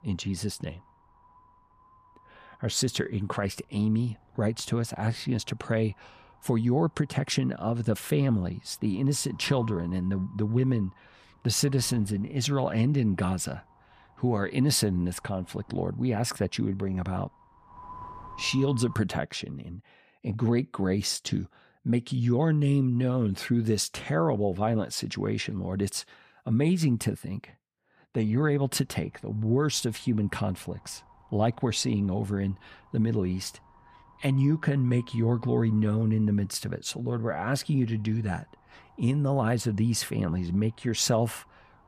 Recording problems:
wind noise on the microphone; occasional gusts; until 19 s and from 28 s on; 20 dB below the speech

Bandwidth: 15 kHz